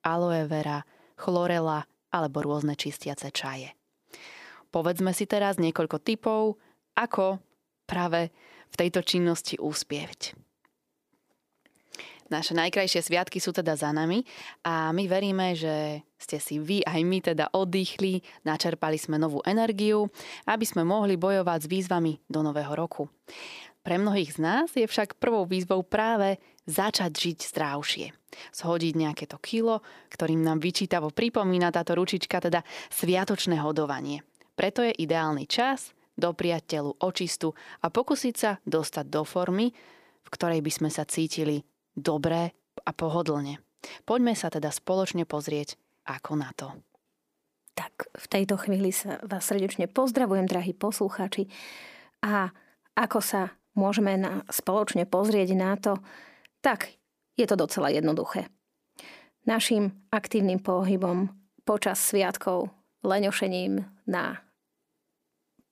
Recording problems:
none

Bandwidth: 15 kHz